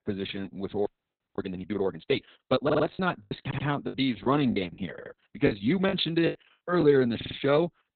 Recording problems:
garbled, watery; badly; nothing above 4 kHz
choppy; very; 9% of the speech affected
audio freezing; at 1 s for 0.5 s
audio stuttering; 4 times, first at 2.5 s

